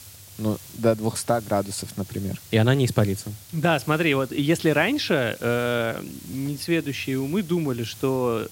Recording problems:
hiss; noticeable; throughout; 20 dB below the speech

